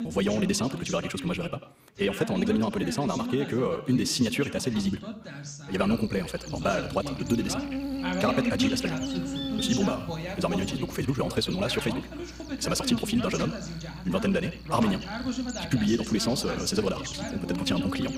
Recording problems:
wrong speed, natural pitch; too fast; 1.7 times normal speed
echo of what is said; noticeable; throughout; 90 ms later, 15 dB below the speech
electrical hum; loud; from 6 s on; 60 Hz, 9 dB below the speech
voice in the background; loud; throughout; 7 dB below the speech

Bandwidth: 15.5 kHz